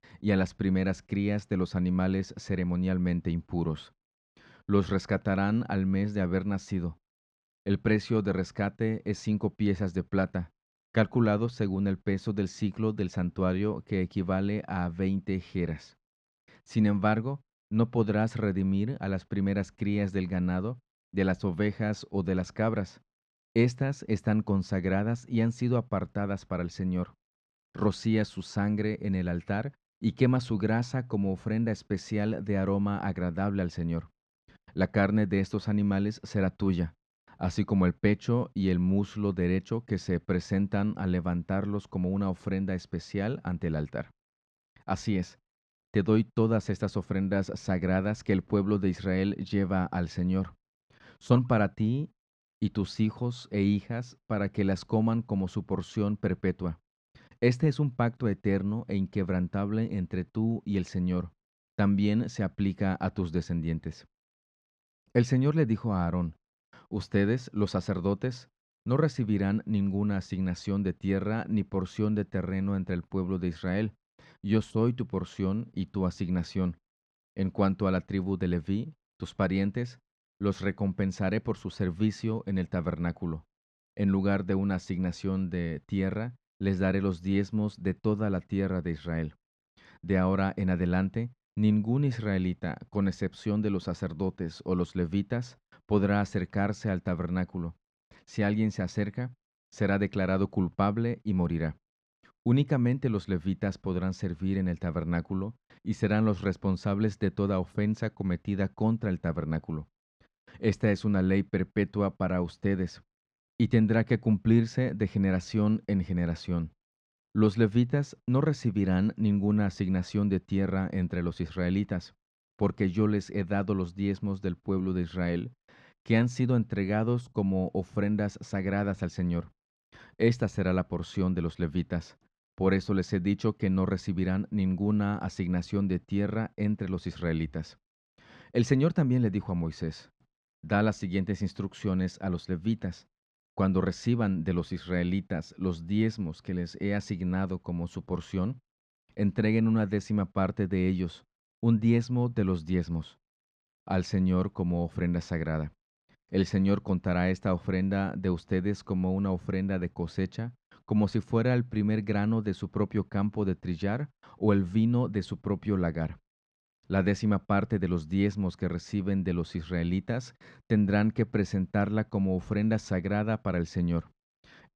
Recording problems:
muffled; slightly; fading above 3 kHz

